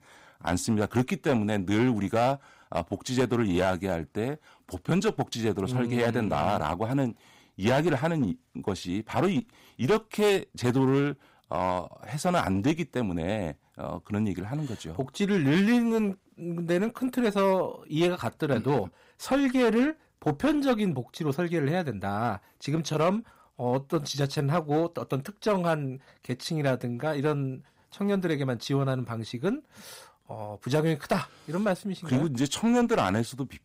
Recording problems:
distortion; slight; 6% of the sound clipped

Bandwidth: 15.5 kHz